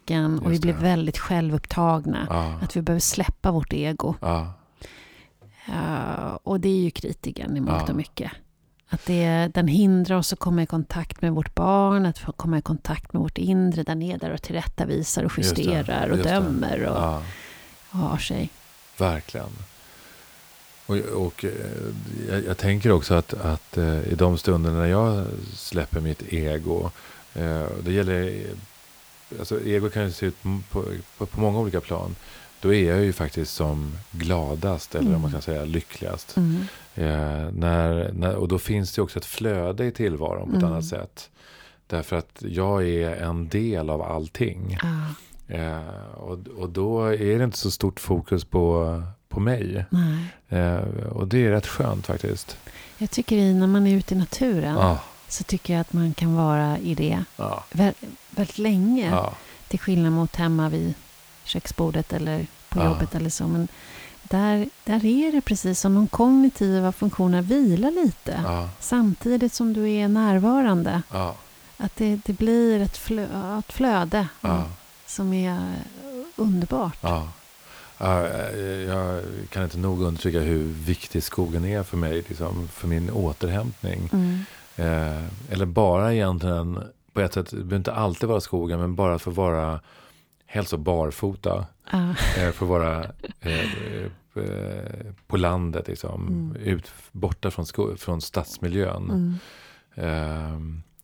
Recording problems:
hiss; faint; from 16 to 37 s and from 52 s to 1:26; 25 dB below the speech

